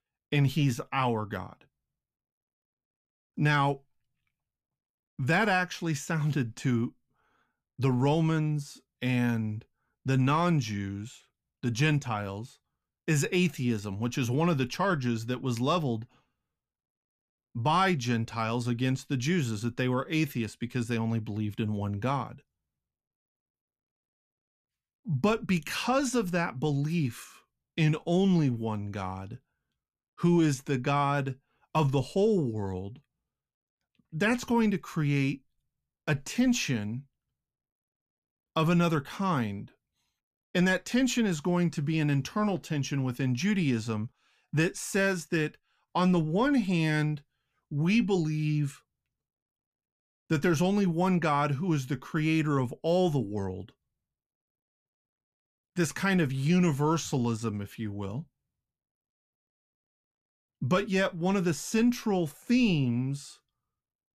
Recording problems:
none

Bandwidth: 14.5 kHz